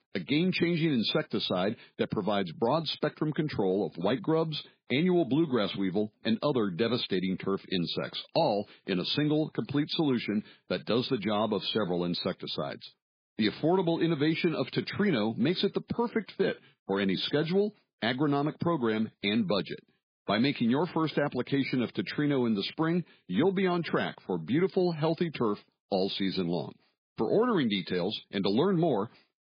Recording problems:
garbled, watery; badly; nothing above 4 kHz

